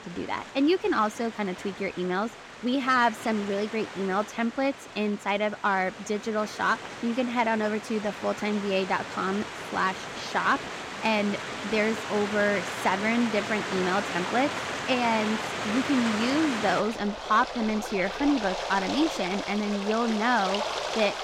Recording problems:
rain or running water; loud; throughout; 6 dB below the speech

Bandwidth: 16.5 kHz